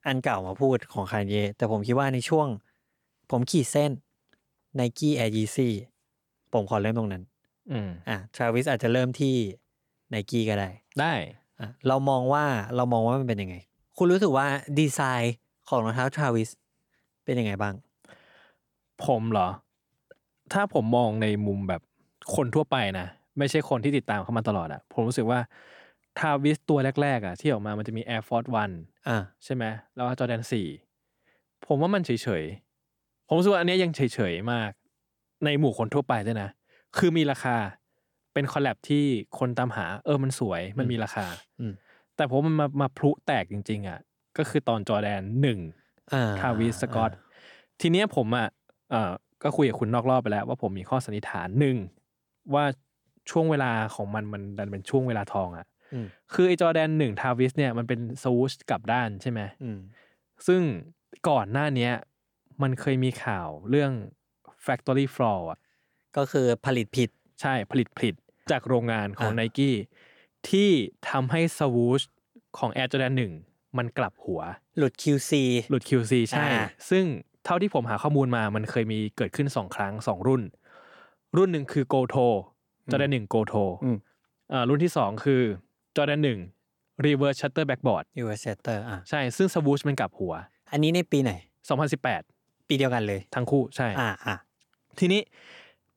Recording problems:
none

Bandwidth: 18.5 kHz